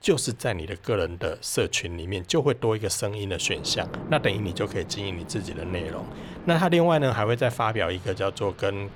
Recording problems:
rain or running water; noticeable; throughout; 15 dB below the speech

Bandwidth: 19 kHz